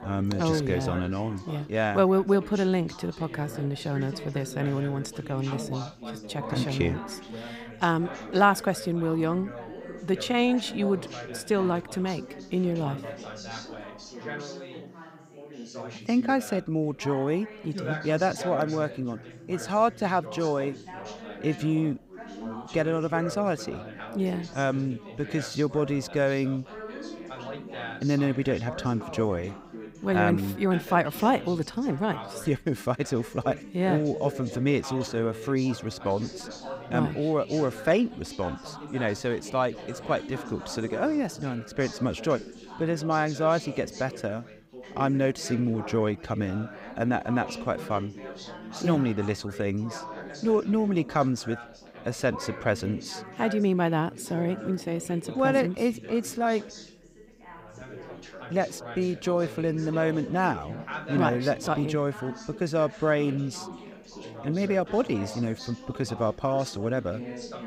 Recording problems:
background chatter; noticeable; throughout; 3 voices, 10 dB below the speech

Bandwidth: 15.5 kHz